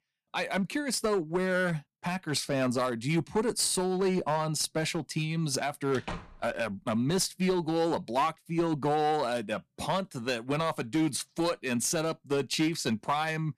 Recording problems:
distortion; slight; 6% of the sound clipped
door banging; faint; at 6 s; peak 10 dB below the speech

